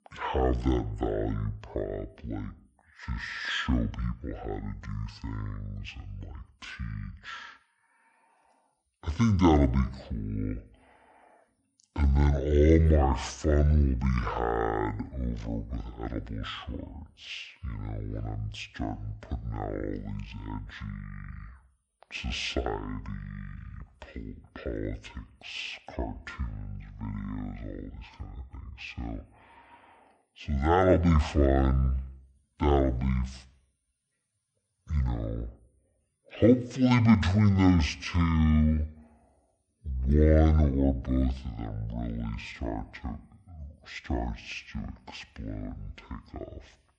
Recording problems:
wrong speed and pitch; too slow and too low; 0.5 times normal speed

